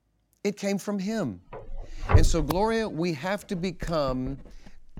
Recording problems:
household noises; loud; from 1.5 s on; as loud as the speech

